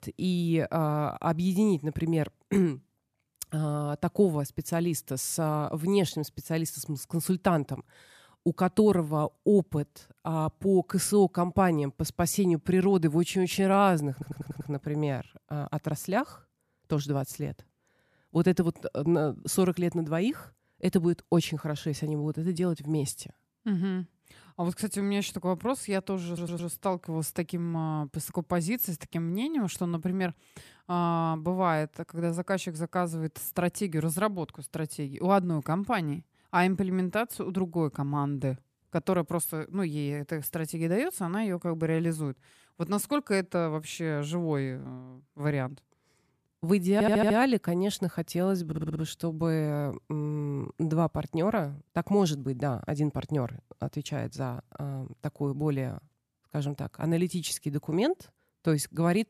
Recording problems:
audio stuttering; 4 times, first at 14 s

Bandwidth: 14.5 kHz